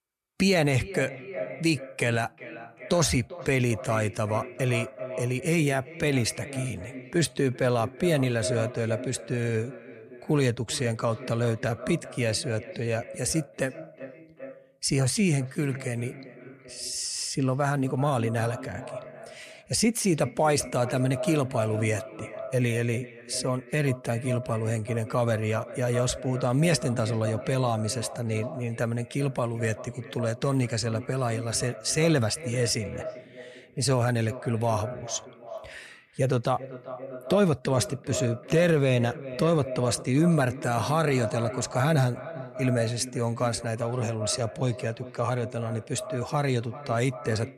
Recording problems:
echo of what is said; noticeable; throughout; 390 ms later, 10 dB below the speech

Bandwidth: 14 kHz